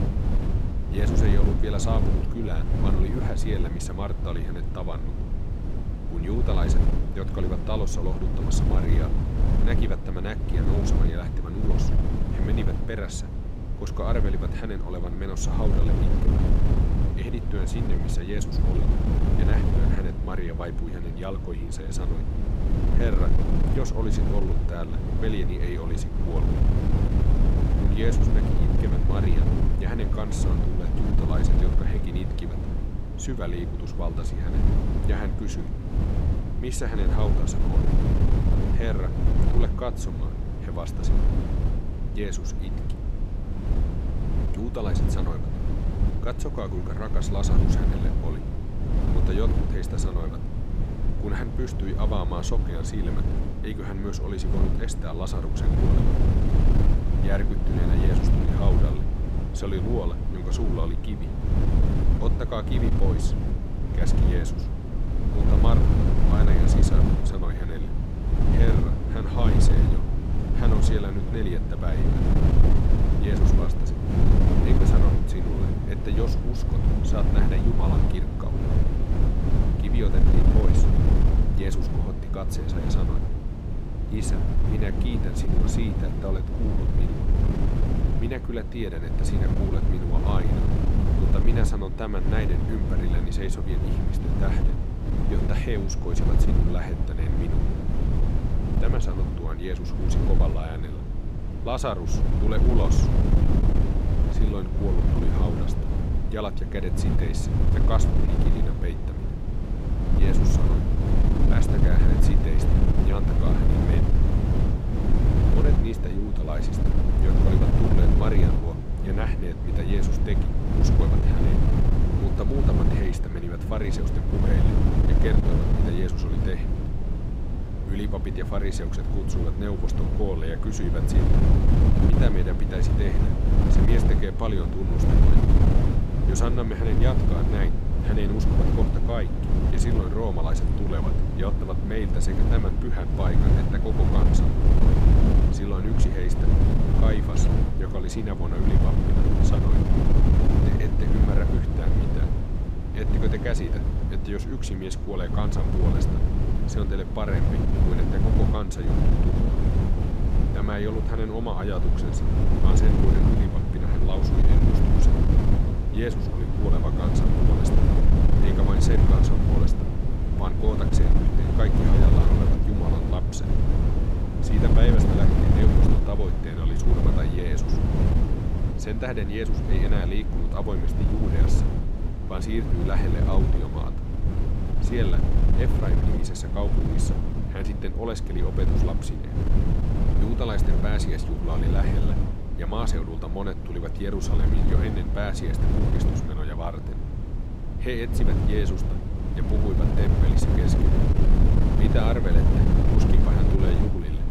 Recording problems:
wind noise on the microphone; heavy; 1 dB above the speech

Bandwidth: 15.5 kHz